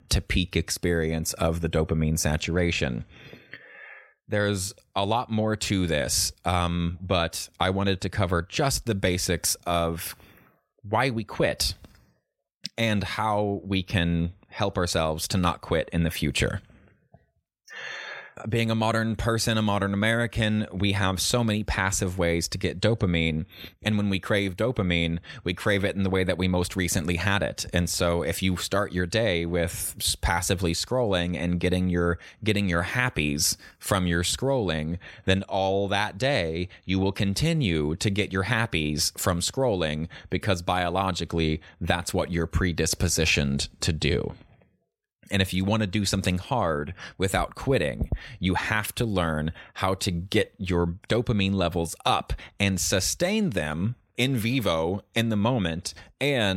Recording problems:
abrupt cut into speech; at the end

